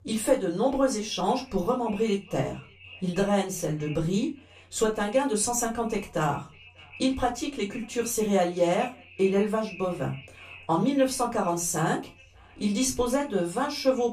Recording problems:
off-mic speech; far
echo of what is said; faint; throughout; 590 ms later, 20 dB below the speech
room echo; very slight; dies away in 0.2 s

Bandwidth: 15 kHz